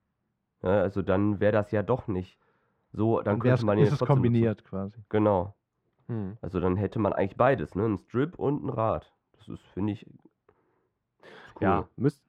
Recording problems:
muffled; very; fading above 4 kHz

